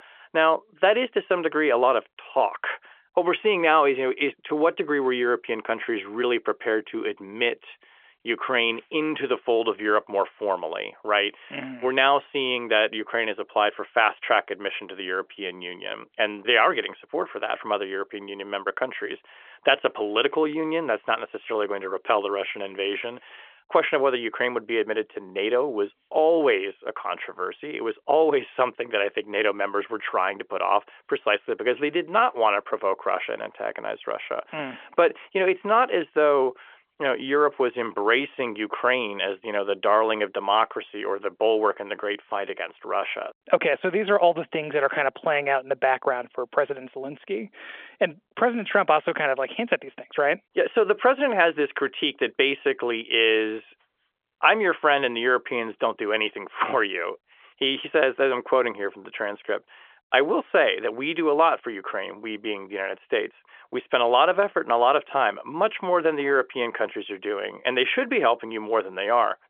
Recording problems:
phone-call audio; nothing above 3.5 kHz

